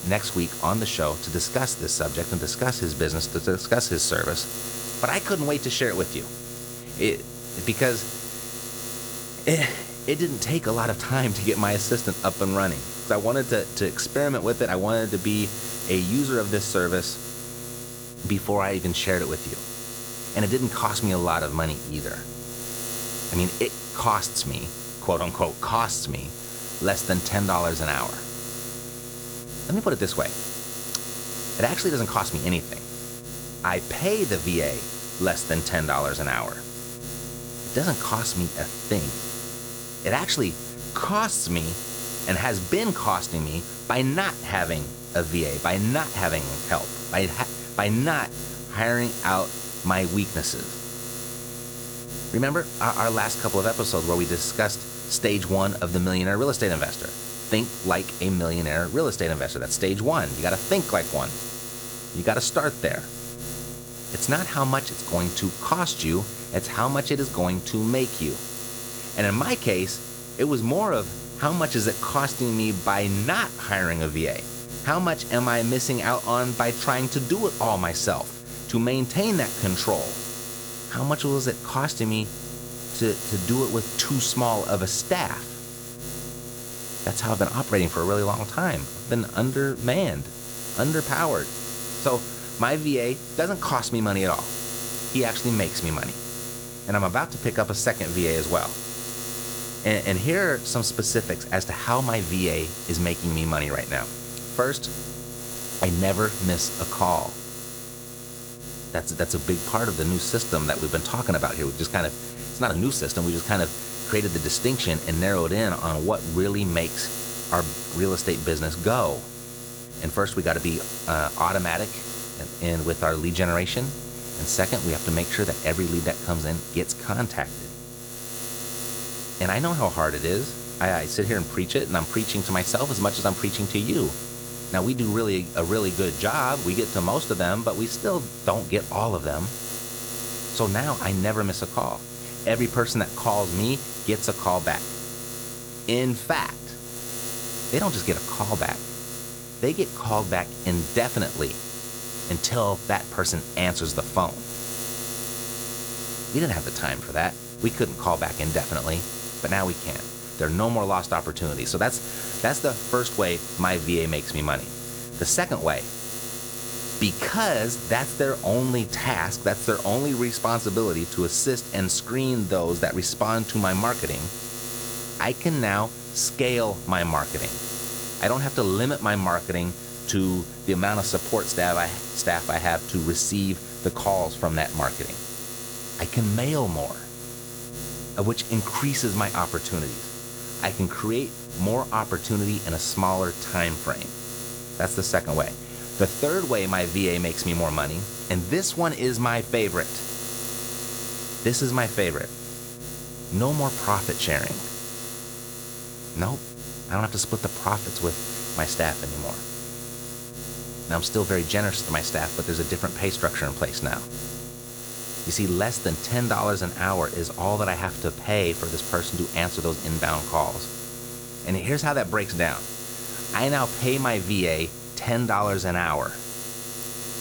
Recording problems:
electrical hum; loud; throughout; 60 Hz, 9 dB below the speech

